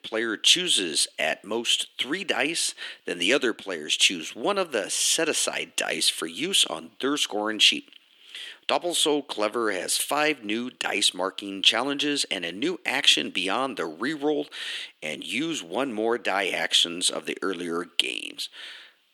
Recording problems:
thin; somewhat; fading below 300 Hz

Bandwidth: 18.5 kHz